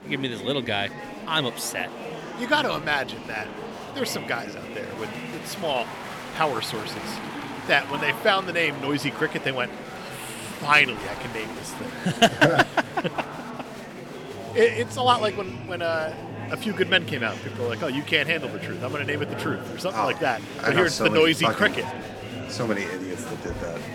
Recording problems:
murmuring crowd; noticeable; throughout; 10 dB below the speech

